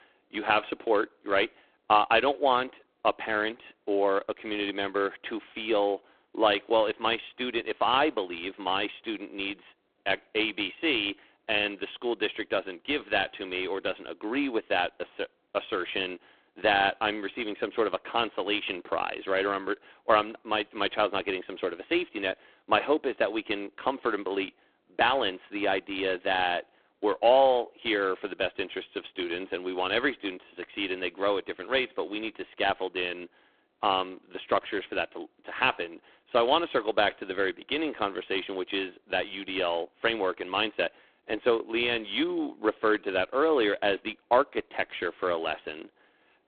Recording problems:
phone-call audio; poor line

